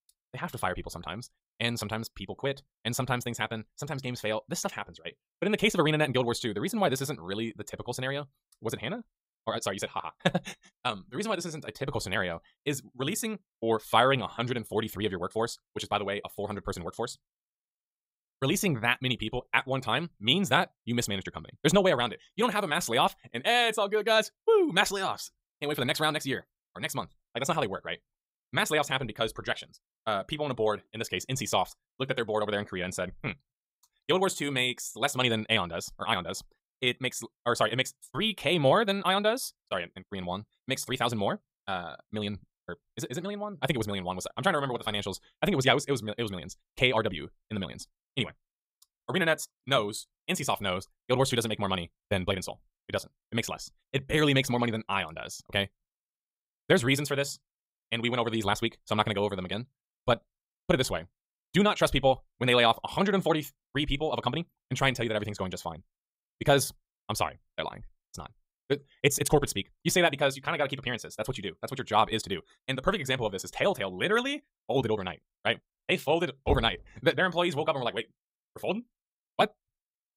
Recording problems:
wrong speed, natural pitch; too fast; 1.7 times normal speed
door banging; noticeable; at 1:16; peak 6 dB below the speech

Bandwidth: 15.5 kHz